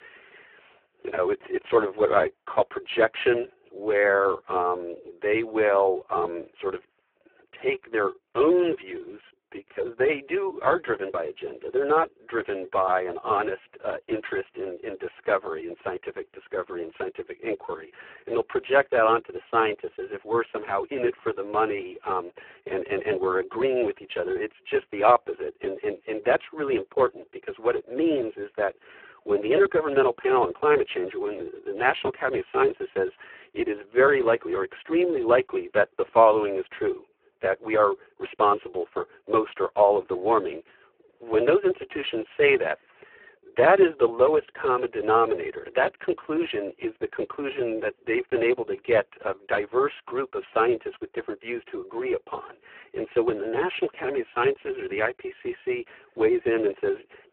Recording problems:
phone-call audio; poor line

